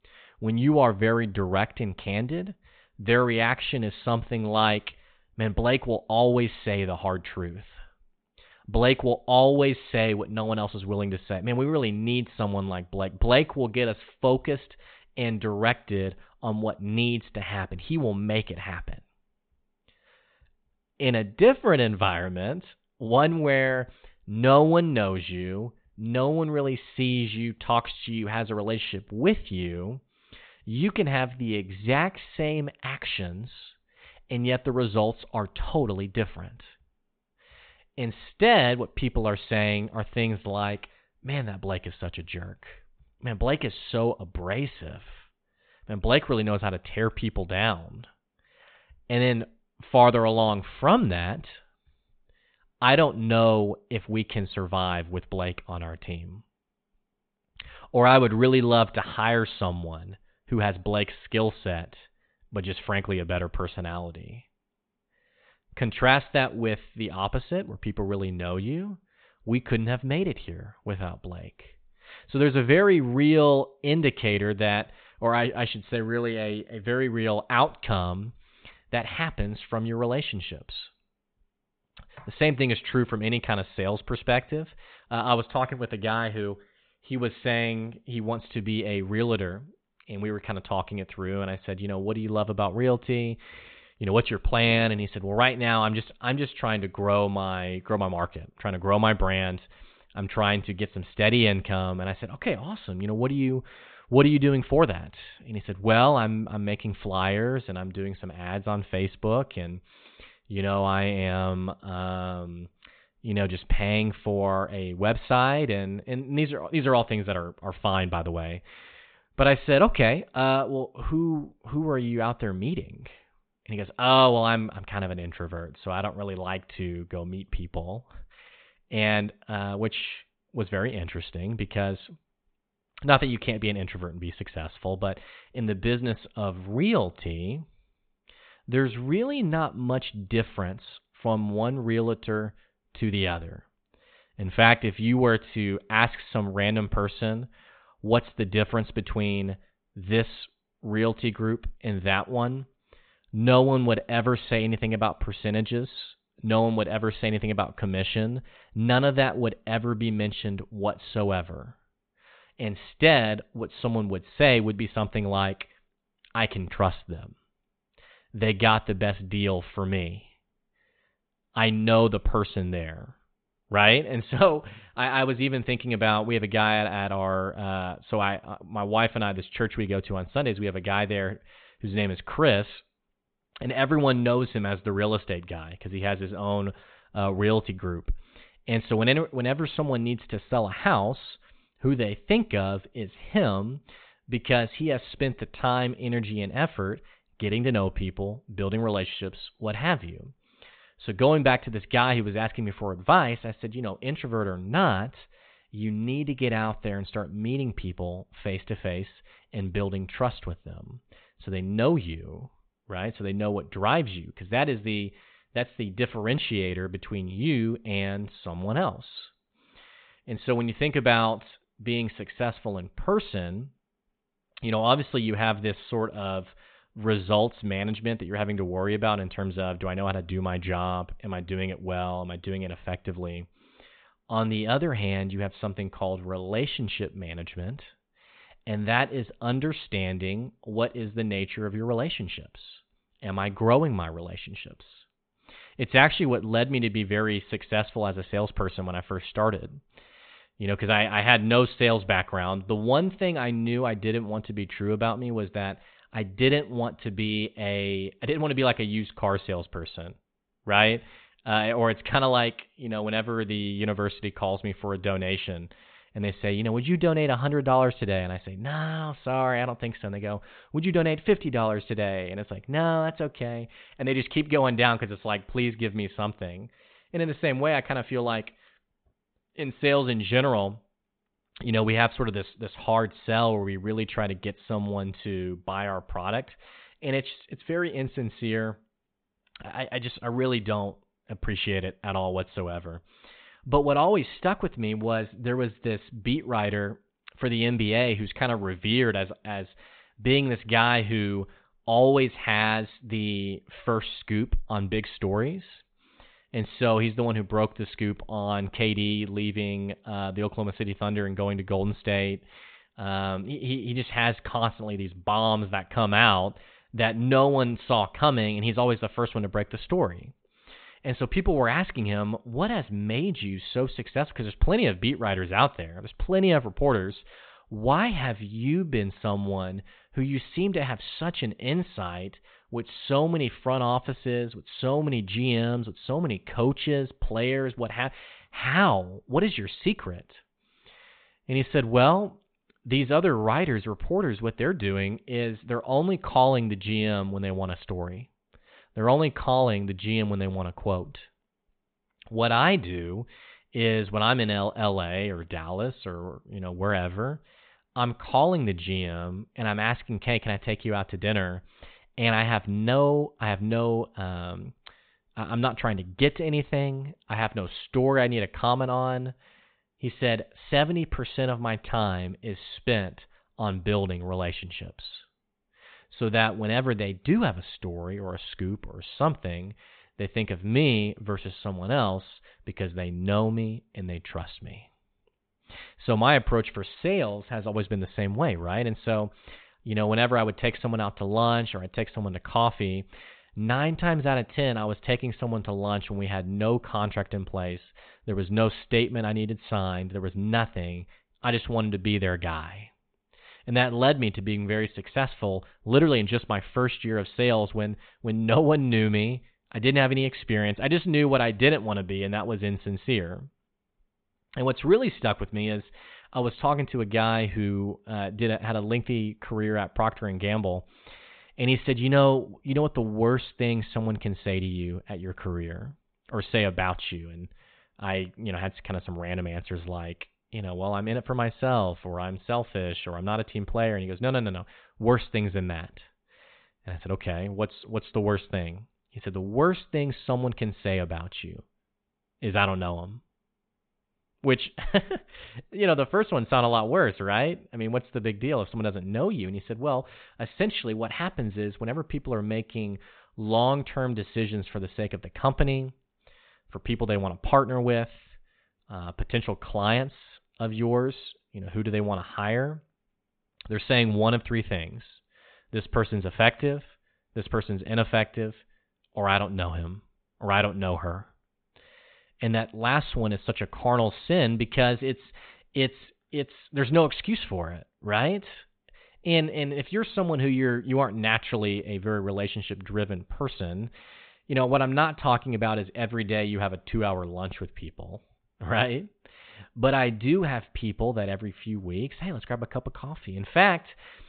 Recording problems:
high frequencies cut off; severe; nothing above 4 kHz

